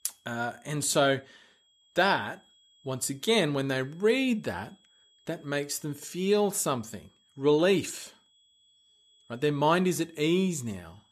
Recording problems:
high-pitched whine; faint; throughout; 3.5 kHz, 35 dB below the speech

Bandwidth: 14.5 kHz